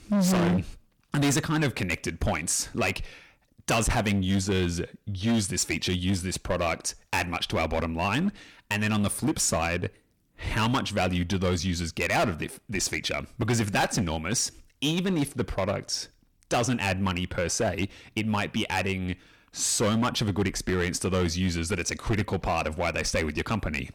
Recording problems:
distortion; heavy; 10% of the sound clipped

